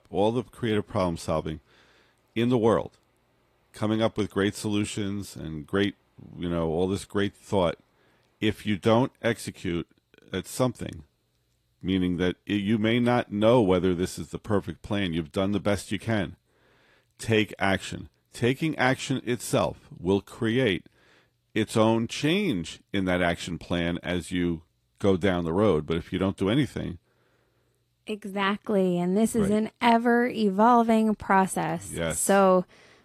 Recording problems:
garbled, watery; slightly

